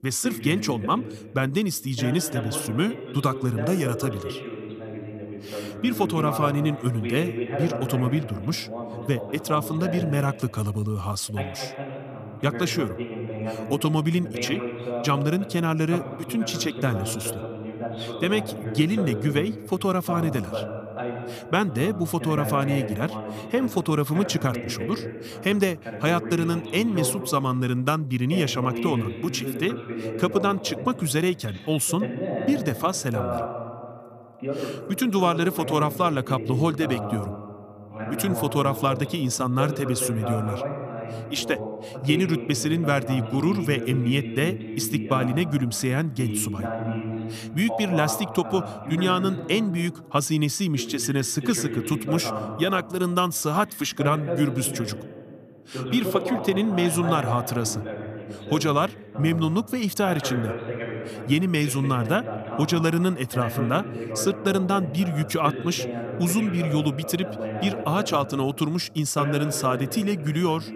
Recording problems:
voice in the background; loud; throughout; 8 dB below the speech

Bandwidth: 14.5 kHz